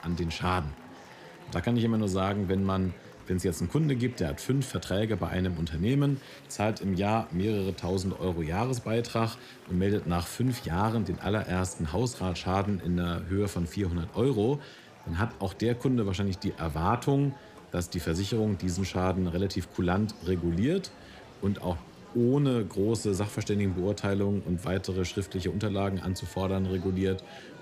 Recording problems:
murmuring crowd; noticeable; throughout; 20 dB below the speech

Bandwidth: 15 kHz